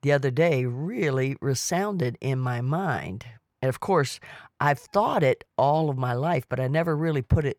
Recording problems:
none

